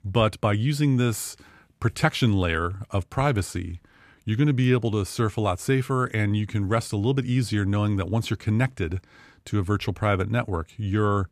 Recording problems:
none

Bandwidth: 14.5 kHz